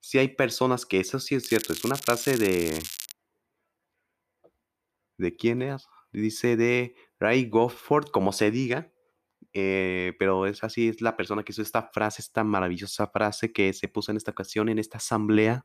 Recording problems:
crackling; loud; from 1.5 to 3 s; 8 dB below the speech

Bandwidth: 14.5 kHz